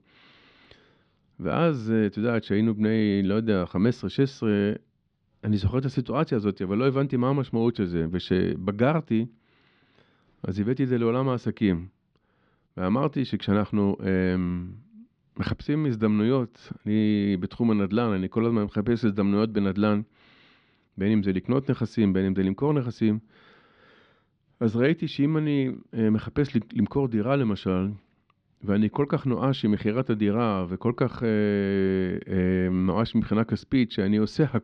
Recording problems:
muffled; very slightly; fading above 4 kHz

